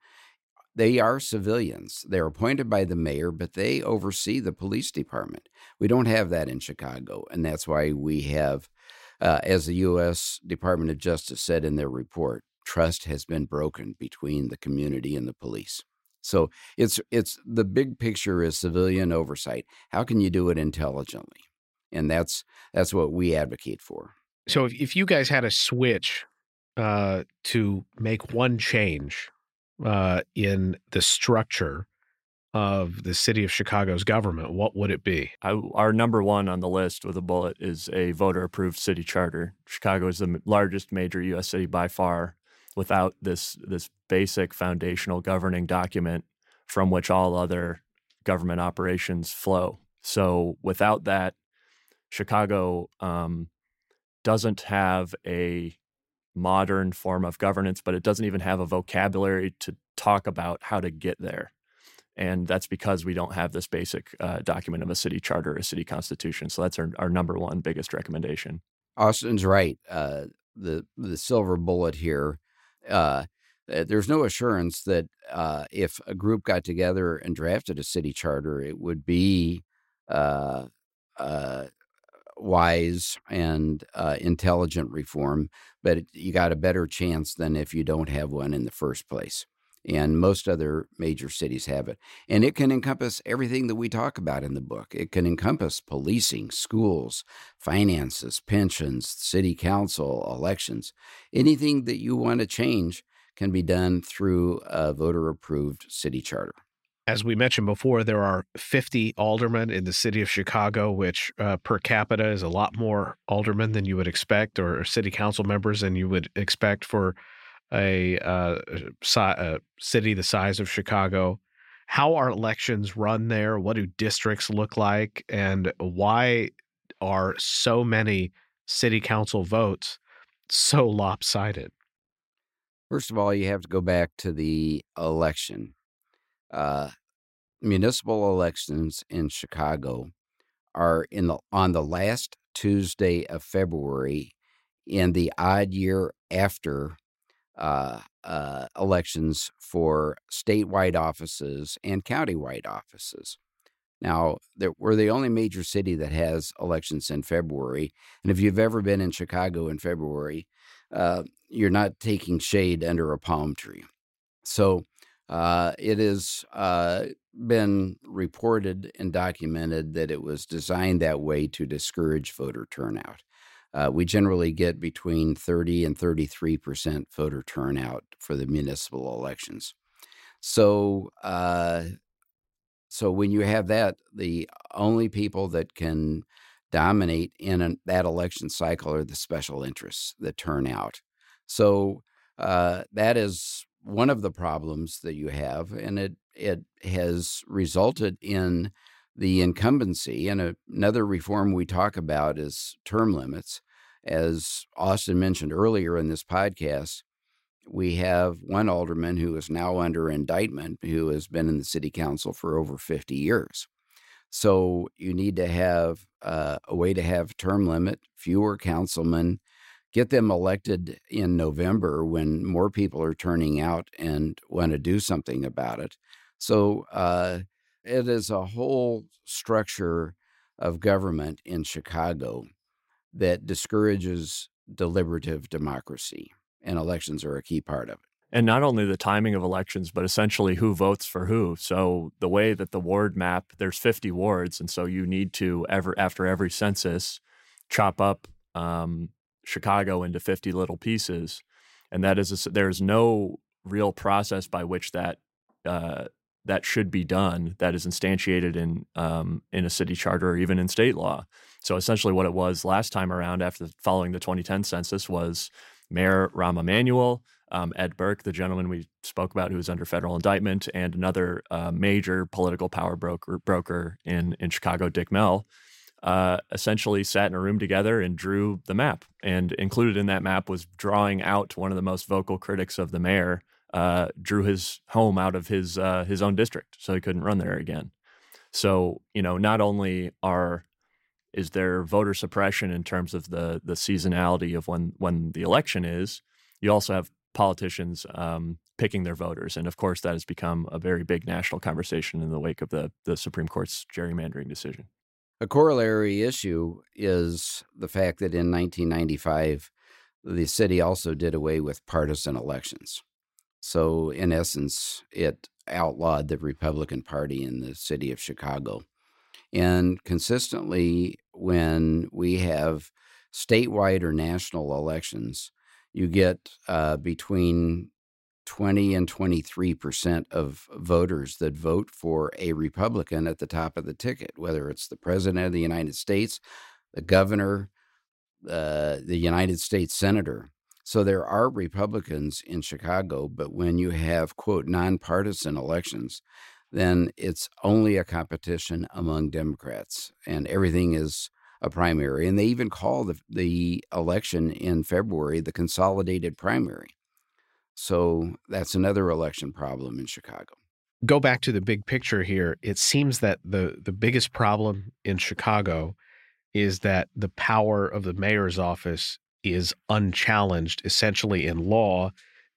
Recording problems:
none

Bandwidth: 16 kHz